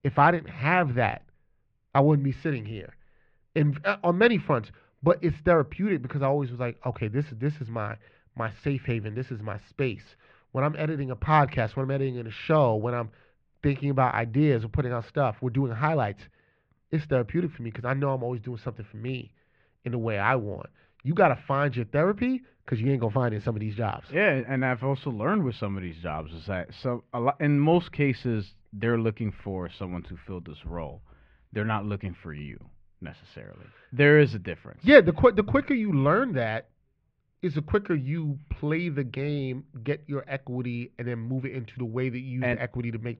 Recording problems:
muffled; very; fading above 2.5 kHz

